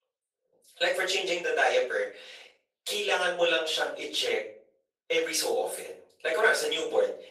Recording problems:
off-mic speech; far
thin; very; fading below 450 Hz
room echo; noticeable; dies away in 0.4 s
garbled, watery; slightly

